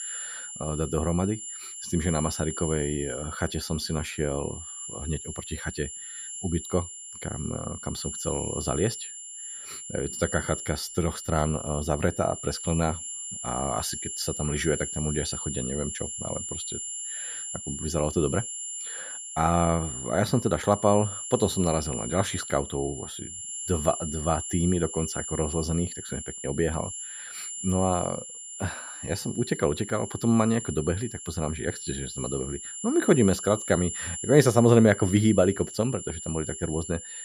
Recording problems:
high-pitched whine; loud; throughout; 7.5 kHz, 7 dB below the speech

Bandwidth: 14.5 kHz